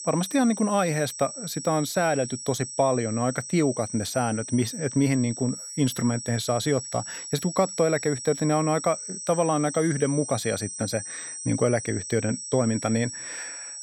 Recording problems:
high-pitched whine; loud; throughout; 8 kHz, 8 dB below the speech

